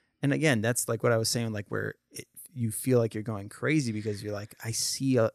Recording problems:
none

